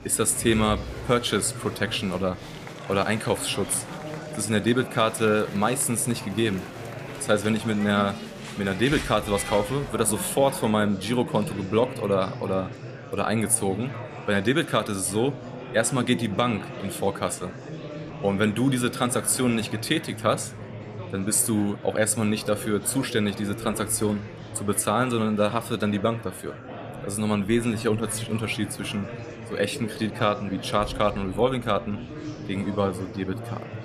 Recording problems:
murmuring crowd; noticeable; throughout; 10 dB below the speech

